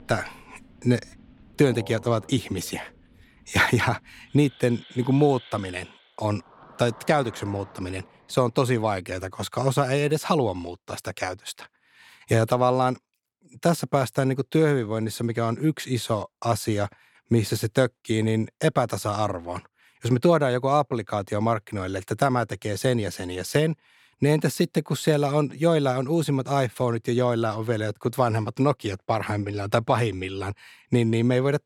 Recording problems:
animal sounds; faint; until 9 s; 25 dB below the speech

